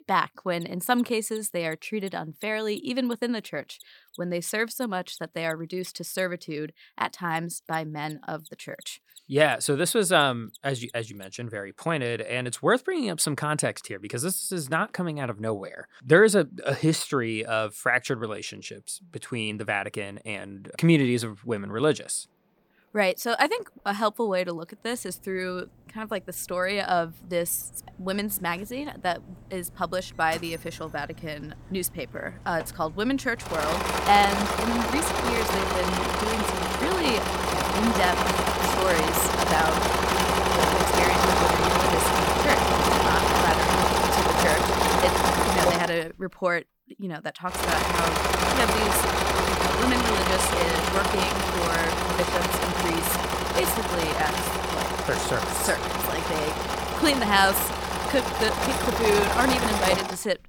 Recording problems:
machinery noise; very loud; throughout; 3 dB above the speech

